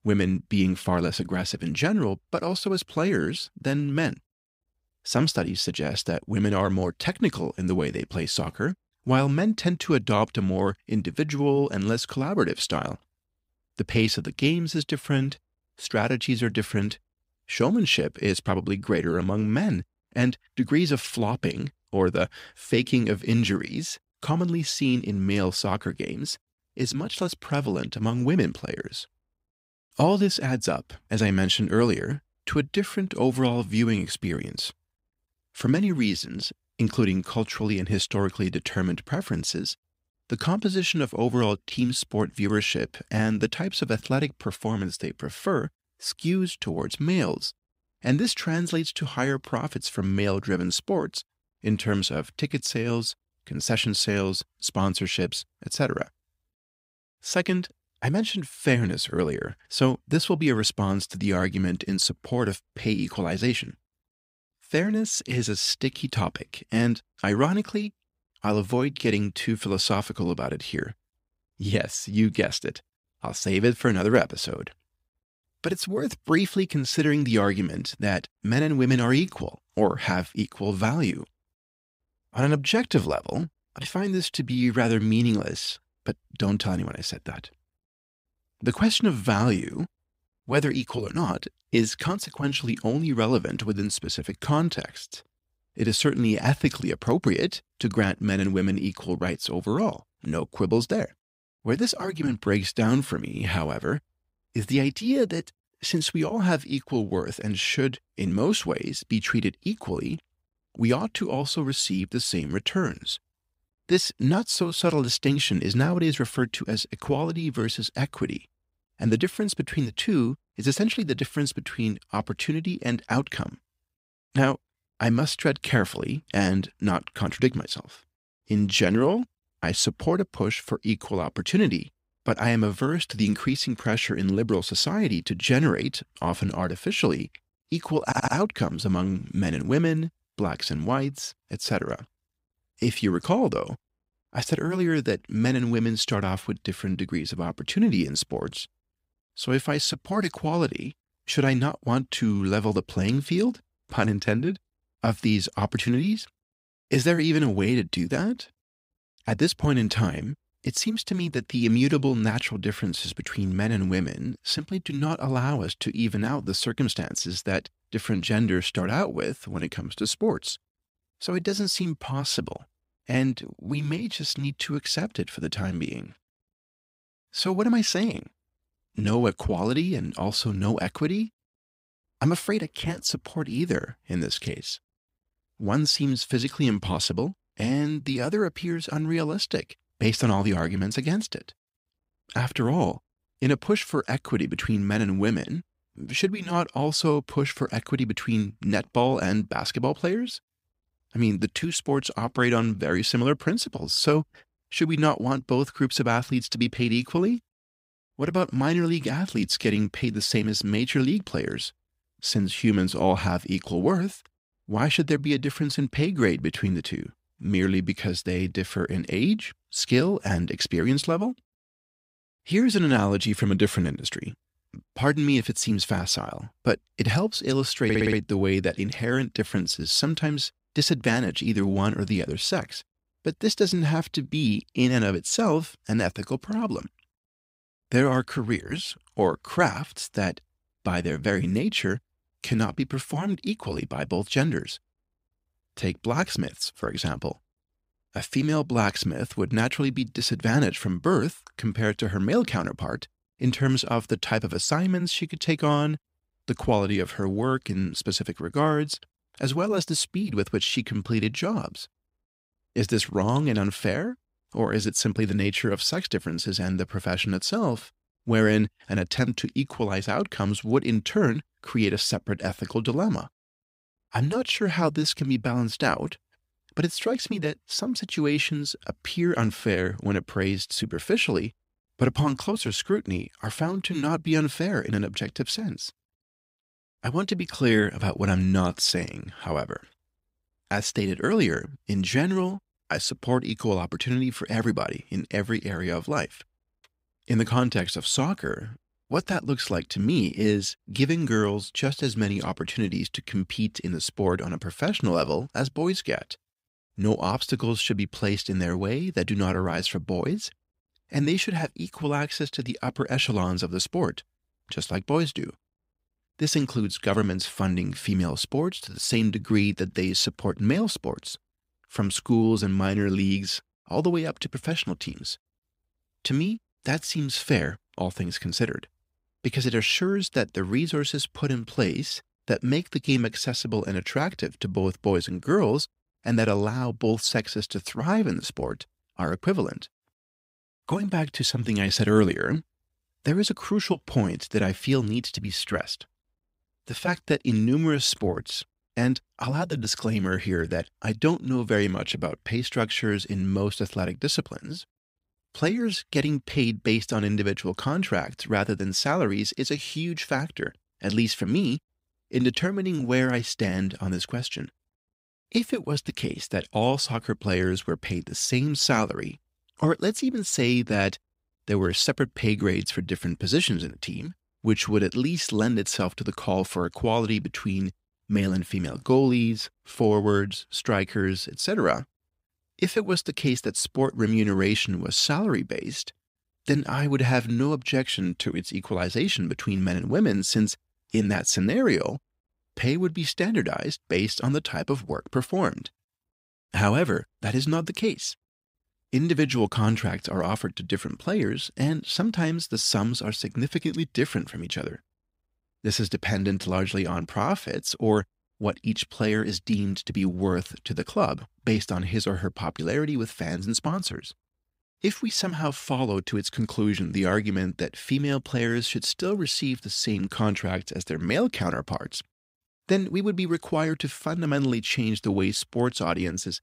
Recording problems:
audio stuttering; at 2:18 and at 3:48

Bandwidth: 15.5 kHz